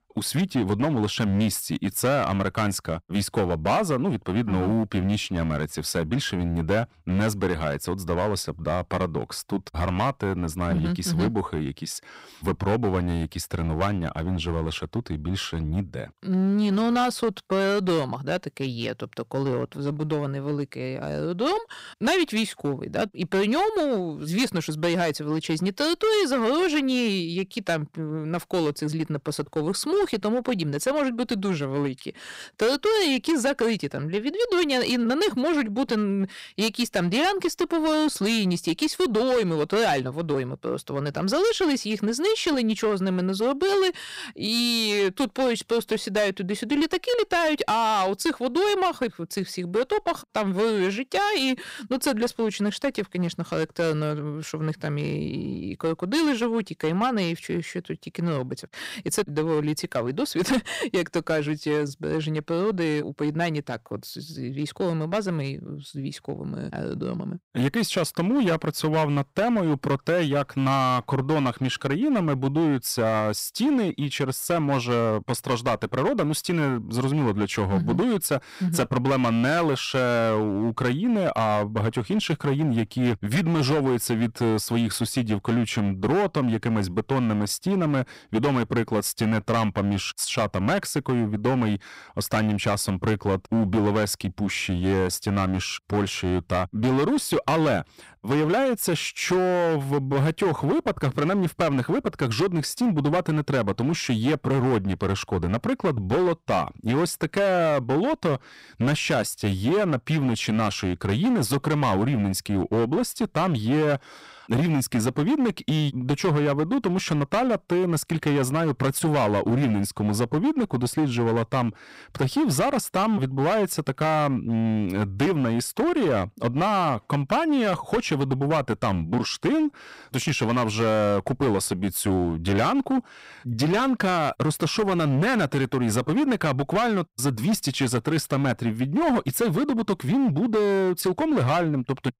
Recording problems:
distortion; slight; 12% of the sound clipped

